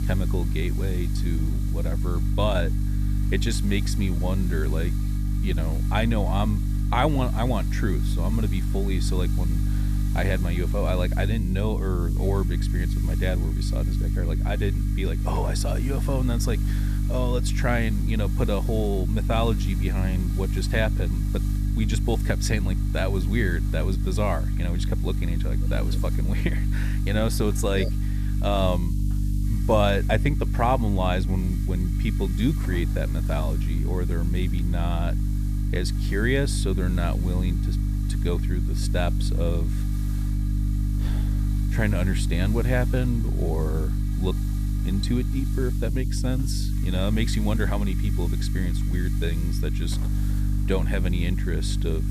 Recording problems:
electrical hum; loud; throughout; 50 Hz, 9 dB below the speech
hiss; noticeable; throughout; 20 dB below the speech

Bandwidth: 14.5 kHz